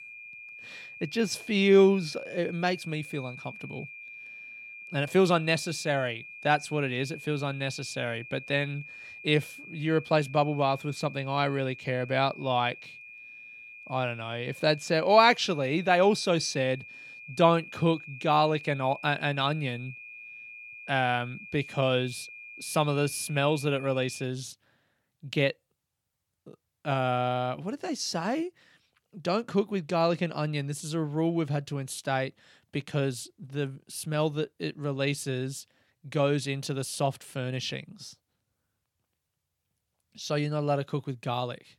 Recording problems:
high-pitched whine; noticeable; until 24 s; 2.5 kHz, 15 dB below the speech

